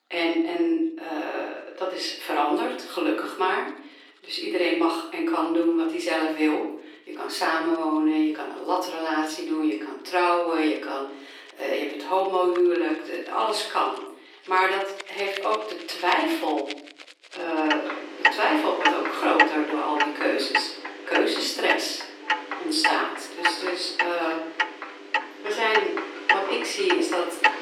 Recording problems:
off-mic speech; far
thin; very; fading below 300 Hz
room echo; noticeable; dies away in 0.6 s
household noises; loud; throughout; 2 dB below the speech

